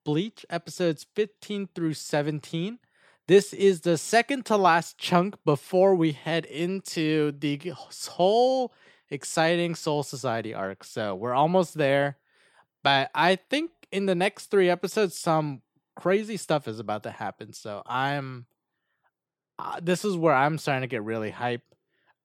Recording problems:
none

